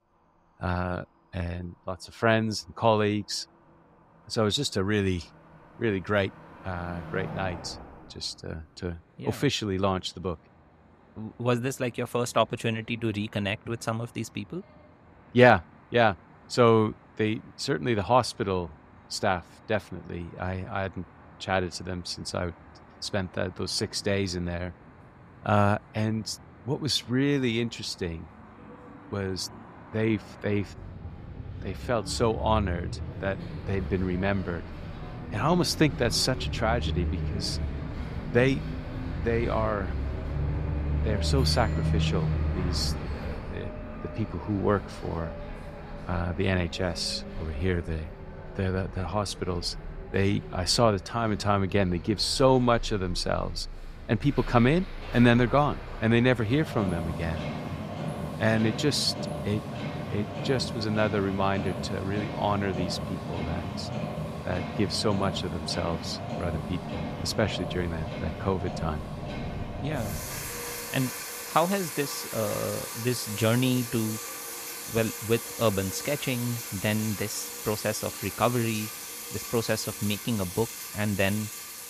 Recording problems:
traffic noise; loud; throughout; 7 dB below the speech

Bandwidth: 15 kHz